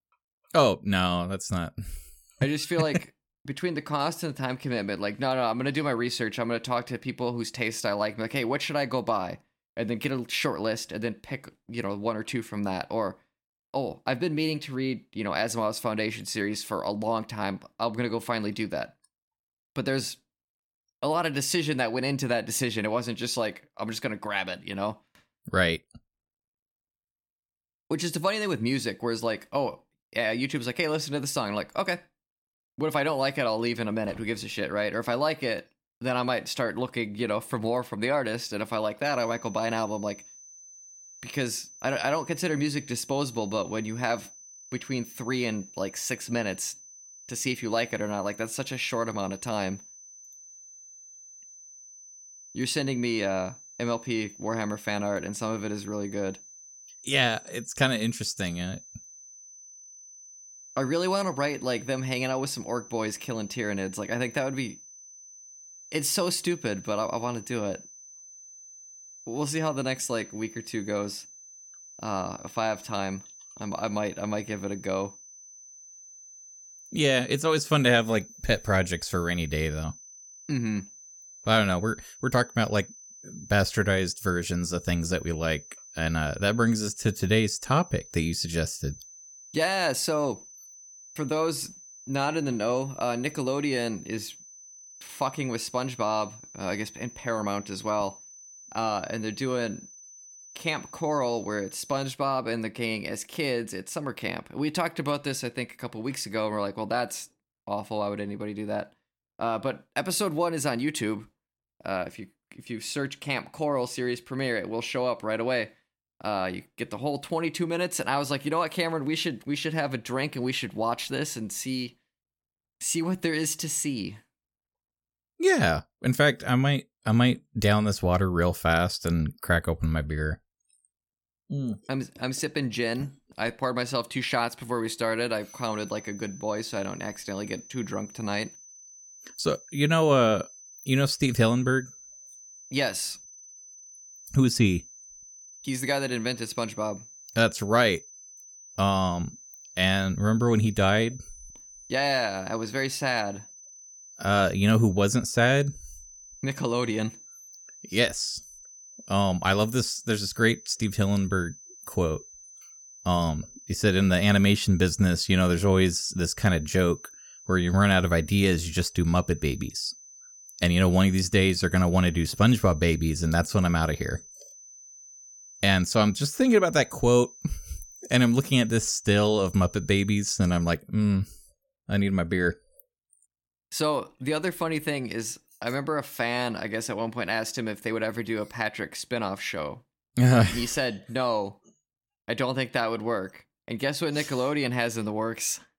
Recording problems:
high-pitched whine; noticeable; from 39 s to 1:42 and from 2:15 to 3:01; 6 kHz, 20 dB below the speech

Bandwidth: 17 kHz